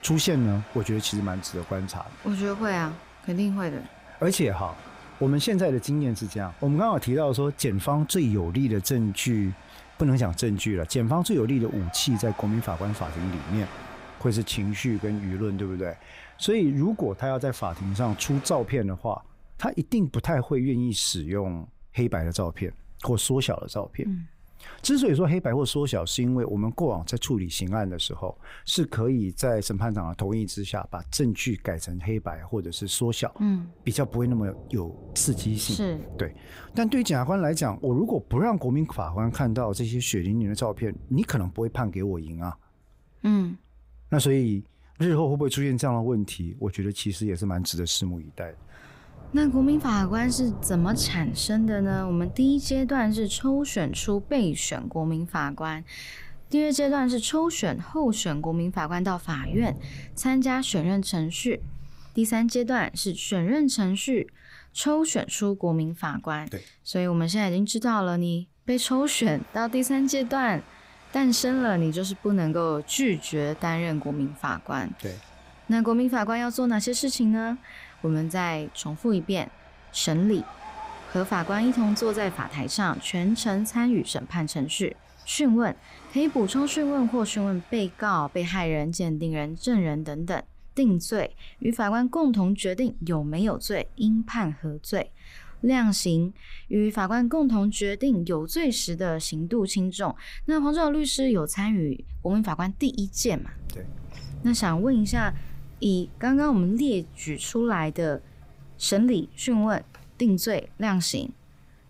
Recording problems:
rain or running water; noticeable; throughout; 20 dB below the speech

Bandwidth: 15.5 kHz